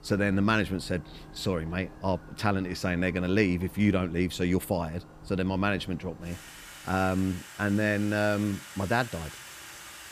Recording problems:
household noises; noticeable; throughout; 15 dB below the speech

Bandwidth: 15 kHz